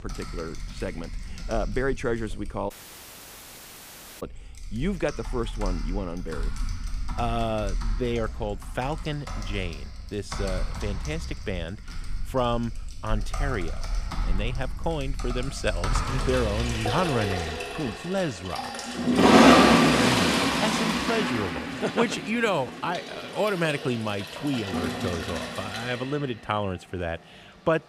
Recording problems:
household noises; very loud; throughout; 3 dB above the speech
audio cutting out; at 2.5 s for 1.5 s

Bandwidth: 15 kHz